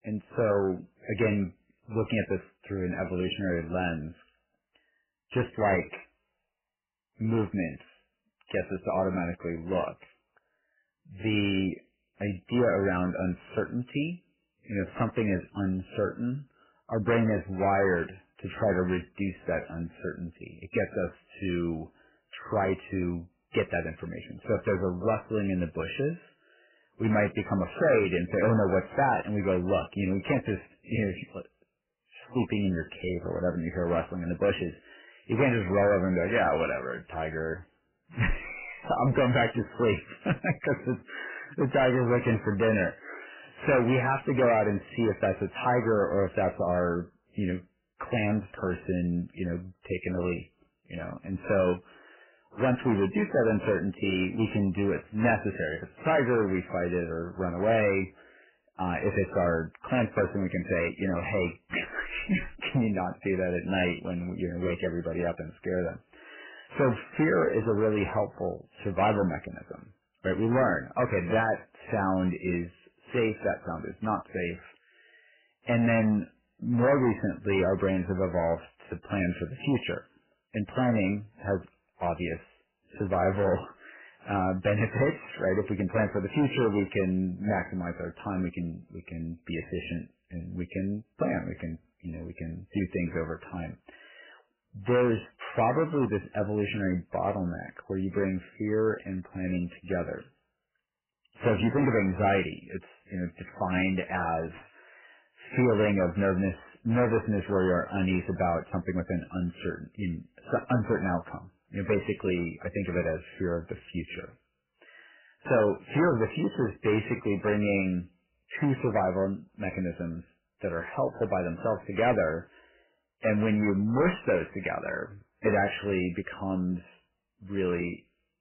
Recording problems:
garbled, watery; badly; nothing above 3 kHz
distortion; slight; 4% of the sound clipped

